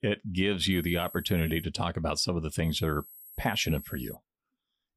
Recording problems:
high-pitched whine; noticeable; at 0.5 s and from 2.5 to 4 s; 11.5 kHz, 15 dB below the speech

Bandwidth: 15 kHz